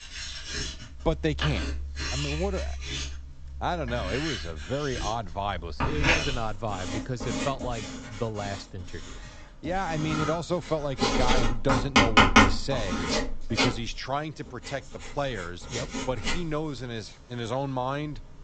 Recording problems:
high frequencies cut off; noticeable; nothing above 8 kHz
household noises; very loud; throughout; 4 dB above the speech

